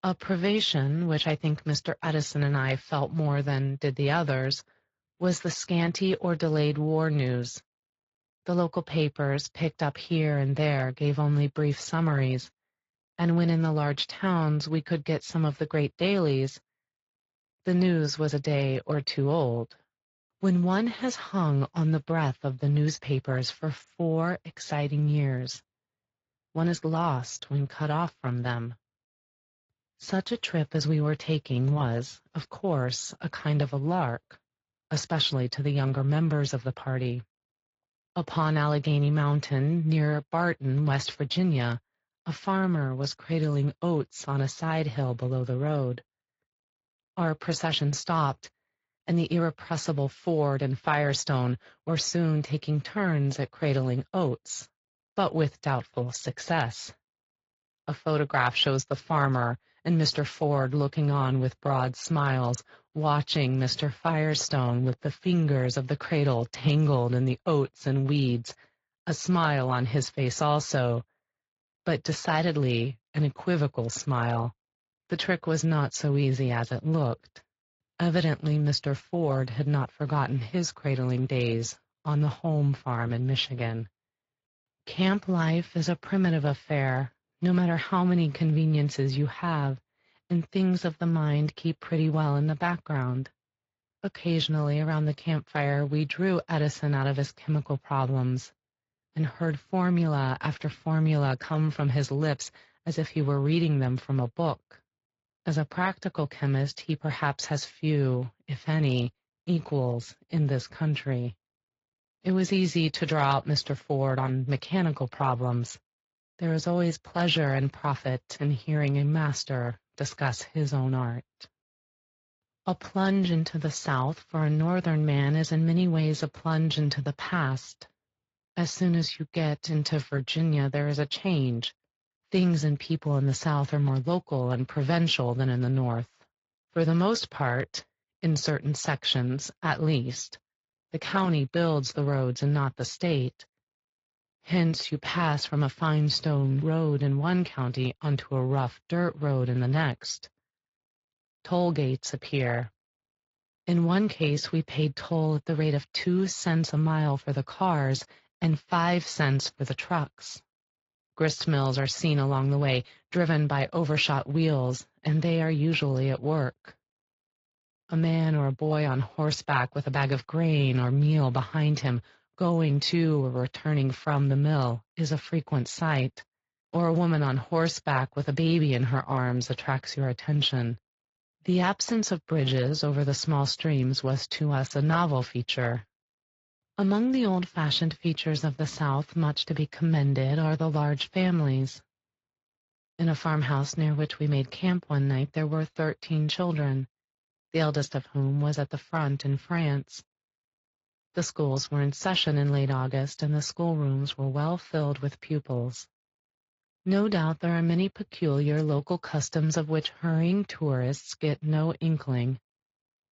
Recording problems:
high frequencies cut off; noticeable; nothing above 7.5 kHz
garbled, watery; slightly

